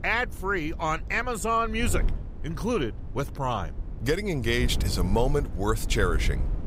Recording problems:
wind noise on the microphone; occasional gusts; 20 dB below the speech

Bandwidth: 15.5 kHz